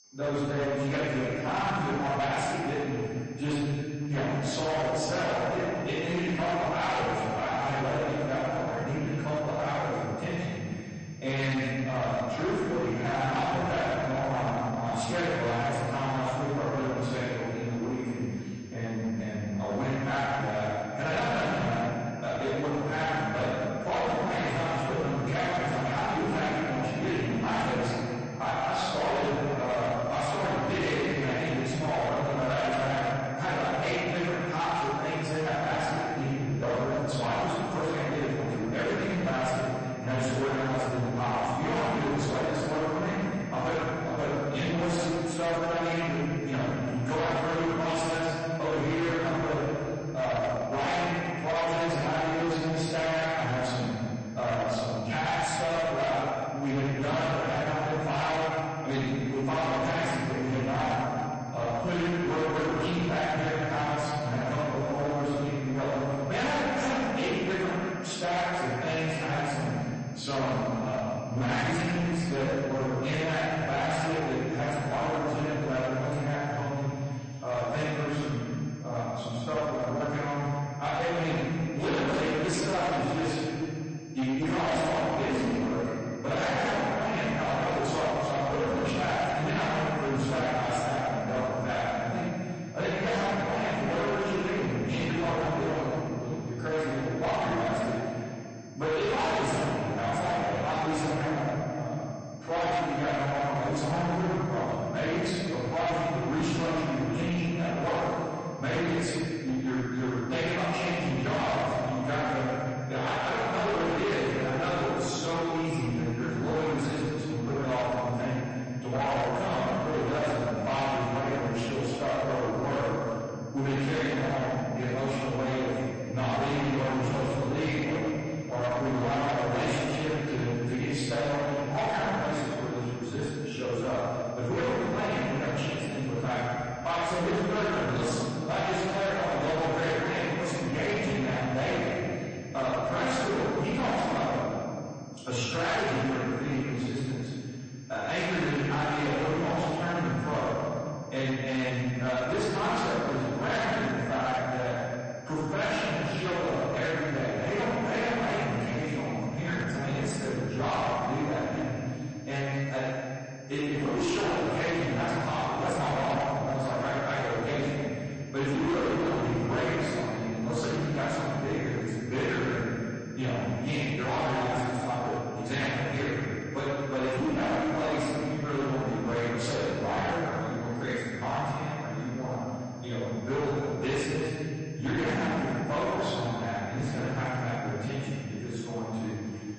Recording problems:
distortion; heavy; 28% of the sound clipped
room echo; strong; dies away in 2.5 s
off-mic speech; far
garbled, watery; slightly; nothing above 8 kHz
high-pitched whine; faint; throughout; 6.5 kHz, 25 dB below the speech

